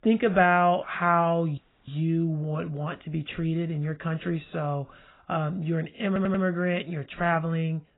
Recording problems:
garbled, watery; badly; nothing above 4 kHz
audio cutting out; at 1.5 s
audio stuttering; at 6 s

